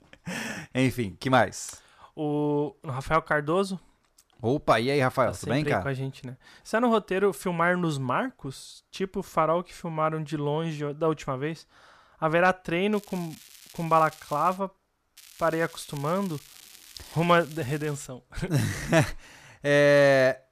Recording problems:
crackling; faint; from 13 to 15 s and from 15 to 18 s; 20 dB below the speech

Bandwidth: 14.5 kHz